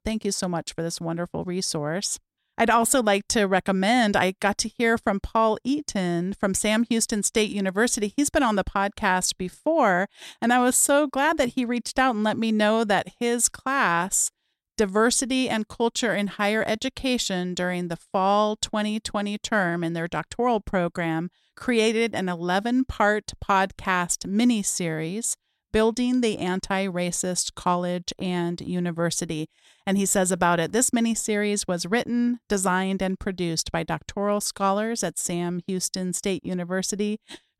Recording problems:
none

